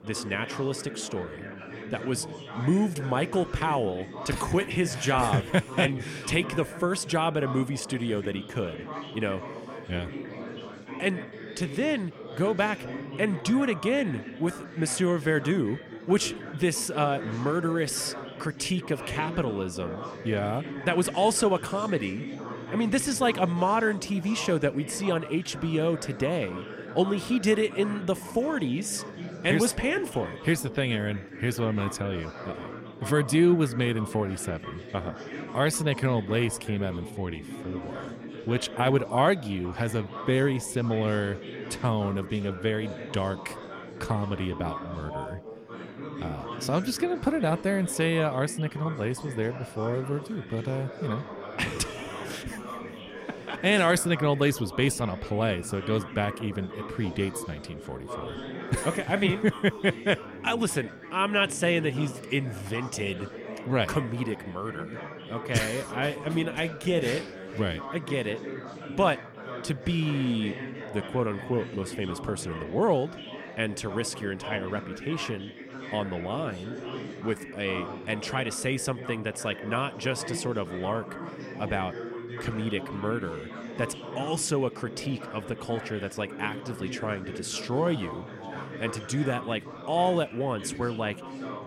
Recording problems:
chatter from many people; noticeable; throughout; 10 dB below the speech

